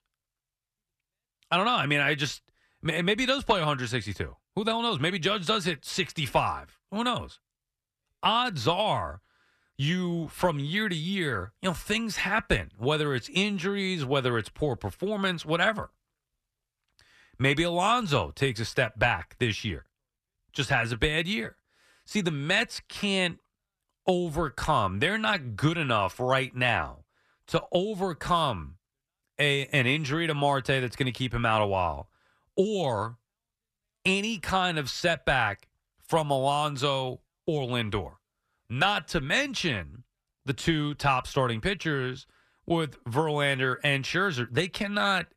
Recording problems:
none

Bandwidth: 14 kHz